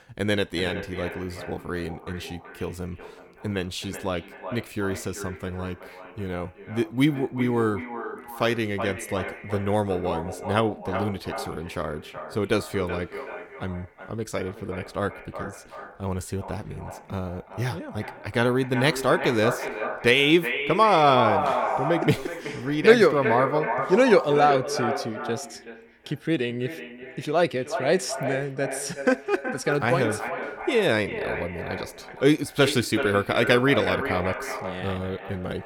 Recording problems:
echo of what is said; strong; throughout; 380 ms later, 7 dB below the speech

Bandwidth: 18 kHz